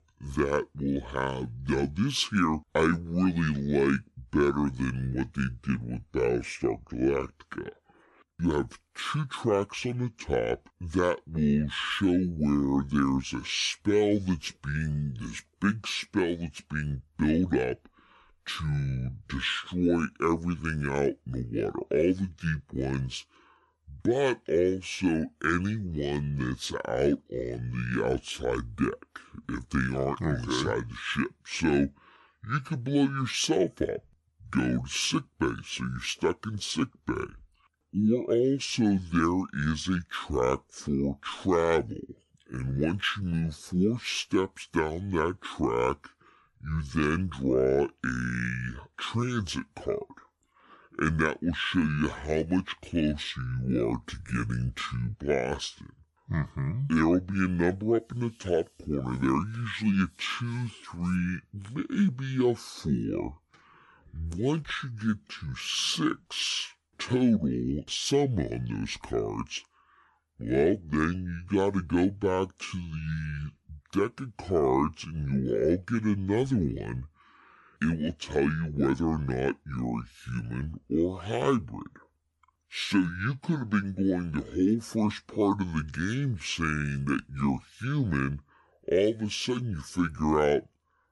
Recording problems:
wrong speed and pitch; too slow and too low; 0.7 times normal speed

